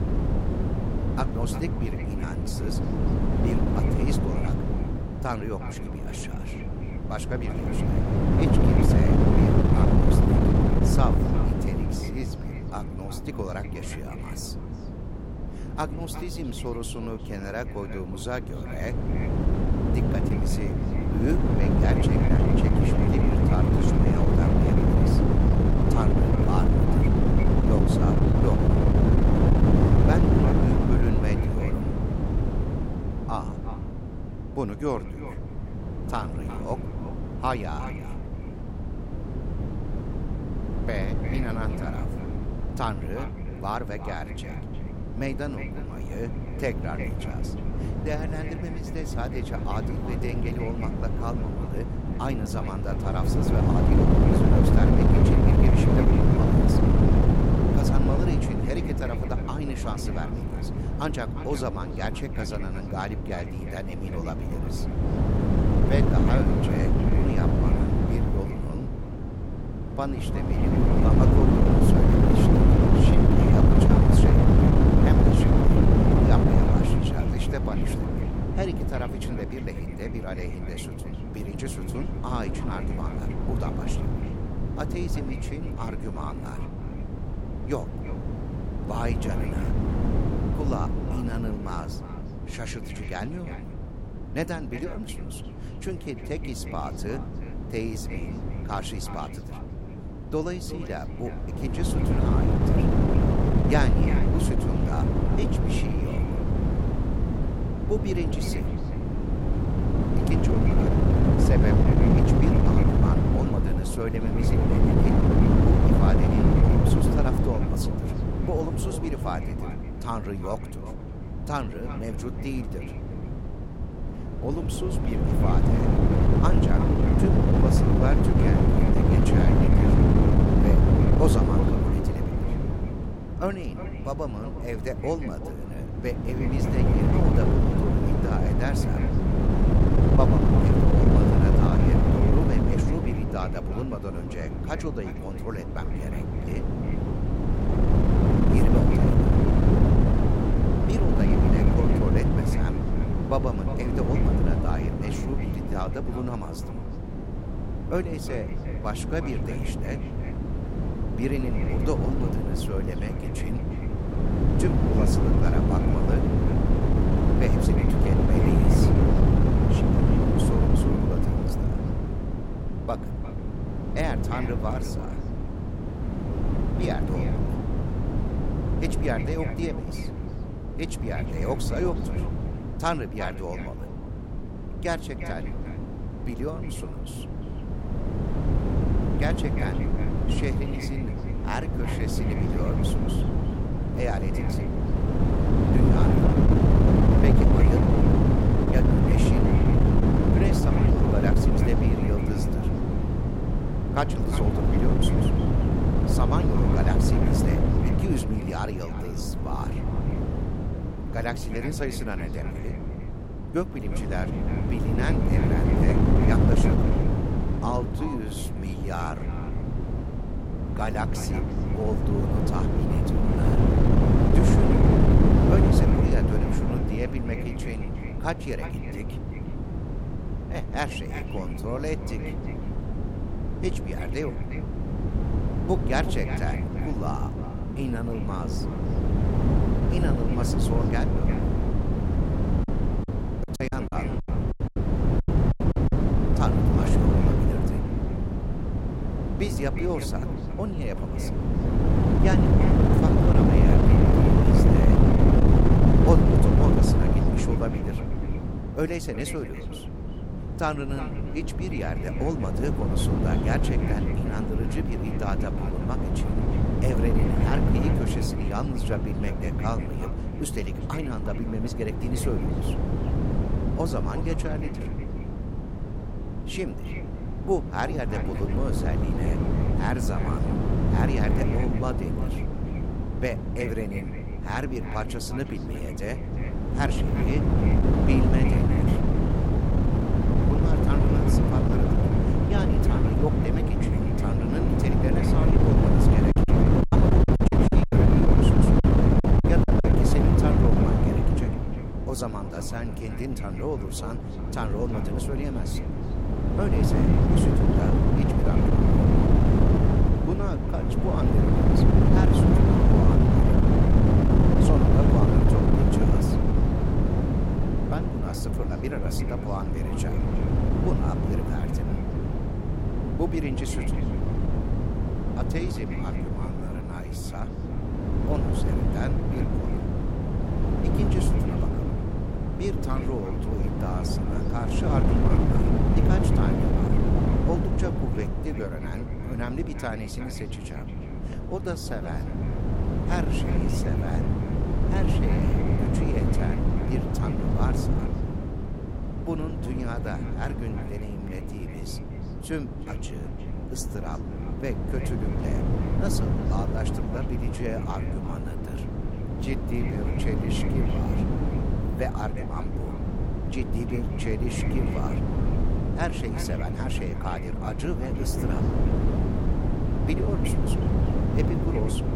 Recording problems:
echo of what is said; noticeable; throughout; 360 ms later, 15 dB below the speech
wind noise on the microphone; heavy; 3 dB above the speech
choppy; very; at 4:03 and from 4:56 to 5:00; 14% of the speech affected

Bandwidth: 16 kHz